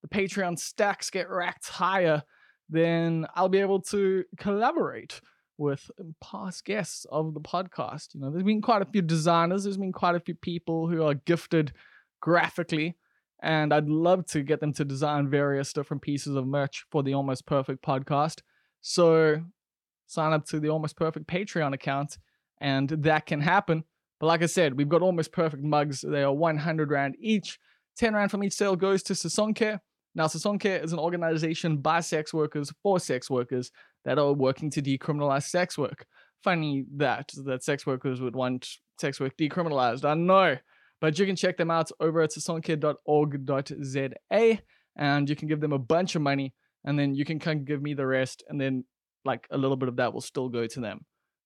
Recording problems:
none

